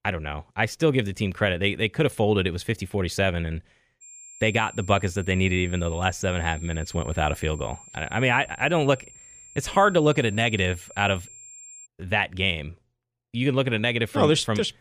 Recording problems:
high-pitched whine; noticeable; from 4 to 12 s; 7.5 kHz, 20 dB below the speech

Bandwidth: 15 kHz